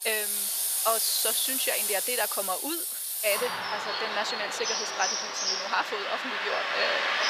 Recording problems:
thin; very; fading below 700 Hz
traffic noise; very loud; throughout; 4 dB above the speech

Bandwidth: 15 kHz